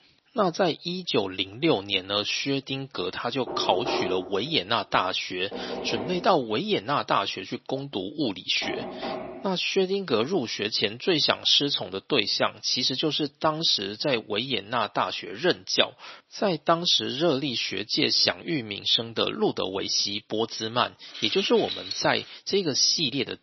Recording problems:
thin; somewhat; fading below 350 Hz
garbled, watery; slightly; nothing above 6 kHz
door banging; noticeable; from 3.5 to 9.5 s; peak 4 dB below the speech
jangling keys; noticeable; from 21 to 22 s; peak 6 dB below the speech

